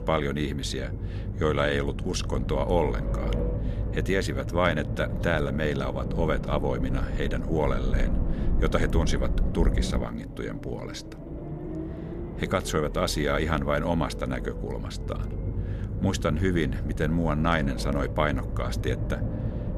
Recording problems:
low rumble; noticeable; throughout; 10 dB below the speech

